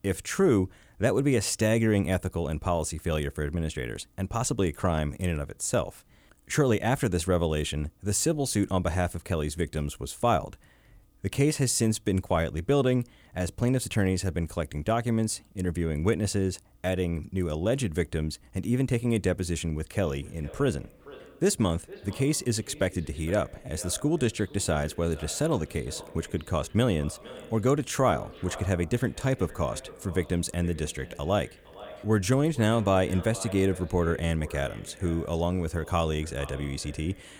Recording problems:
echo of what is said; faint; from 20 s on; 460 ms later, 20 dB below the speech

